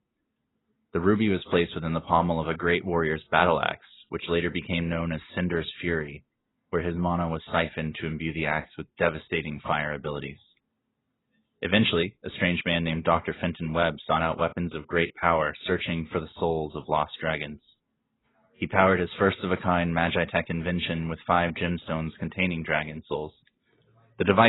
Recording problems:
garbled, watery; badly; nothing above 4 kHz
abrupt cut into speech; at the end

